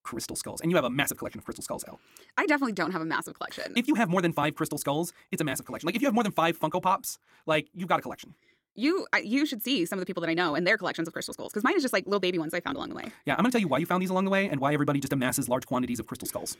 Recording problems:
wrong speed, natural pitch; too fast; 1.7 times normal speed

